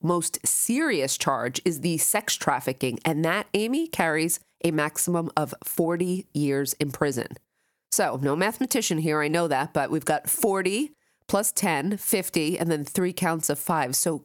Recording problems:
squashed, flat; heavily

